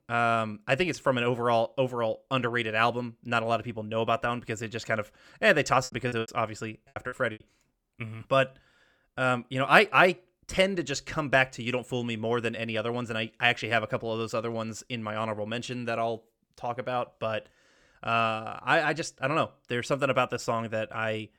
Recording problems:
choppy; very; from 6 to 7.5 s; 24% of the speech affected

